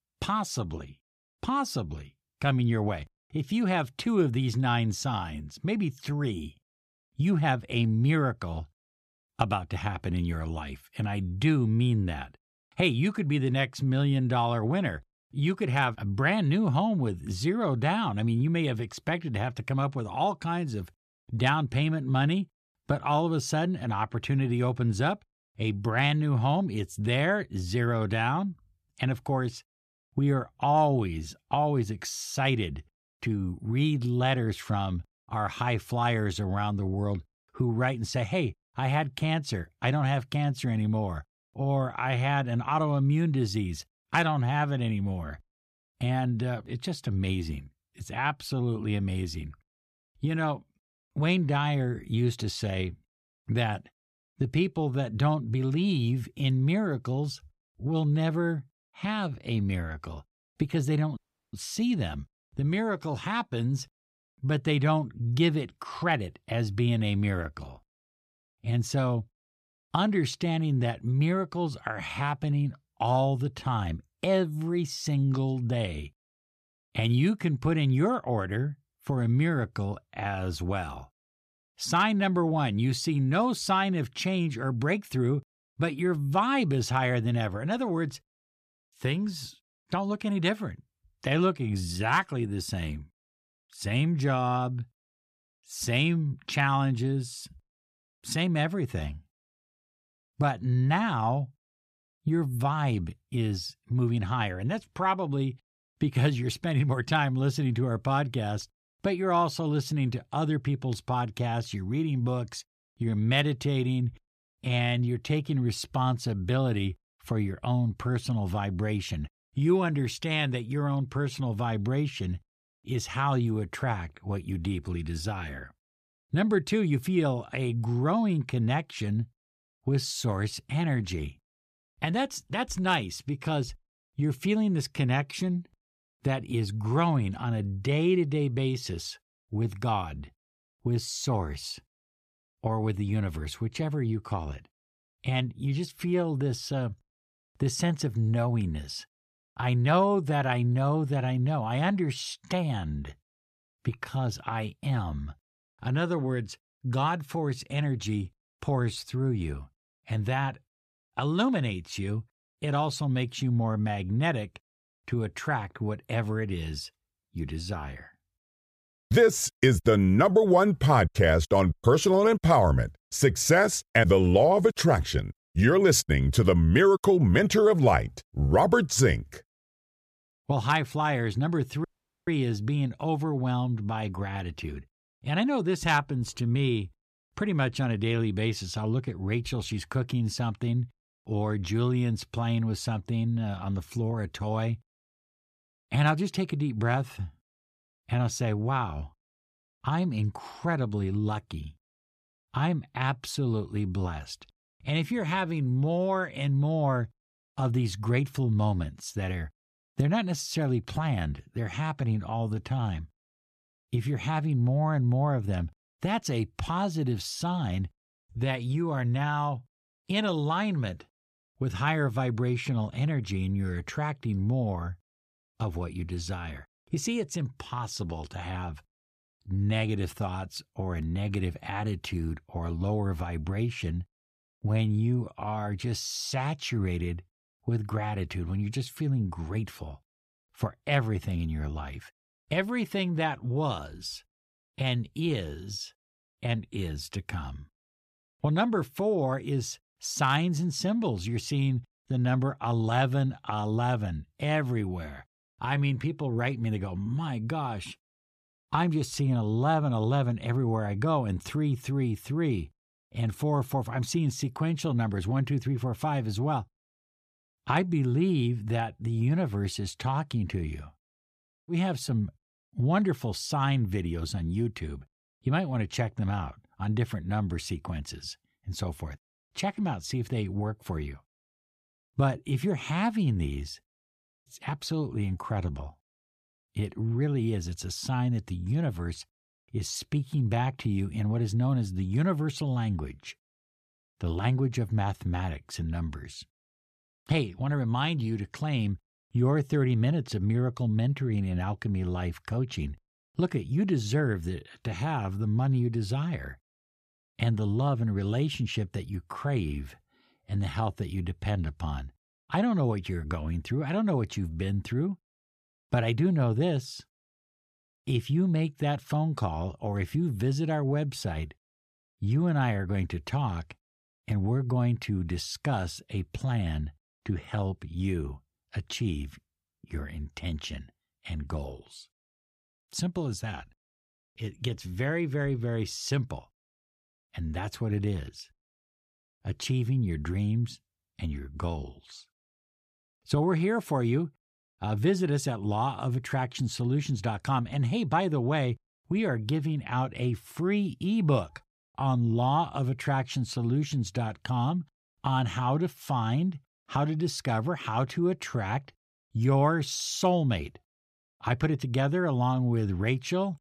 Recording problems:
audio cutting out; at 1:01 and at 3:02

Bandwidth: 14.5 kHz